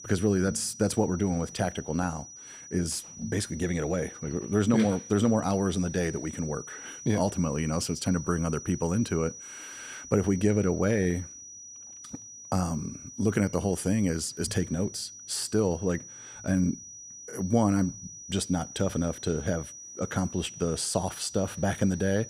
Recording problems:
high-pitched whine; noticeable; throughout; 6 kHz, 15 dB below the speech

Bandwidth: 15.5 kHz